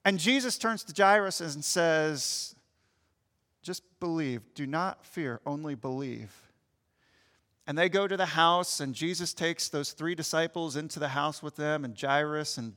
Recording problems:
none

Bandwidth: 18 kHz